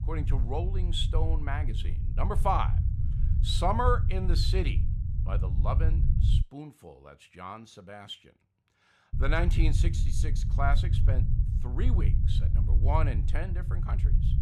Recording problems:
low rumble; noticeable; until 6.5 s and from 9 s on; 10 dB below the speech

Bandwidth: 15 kHz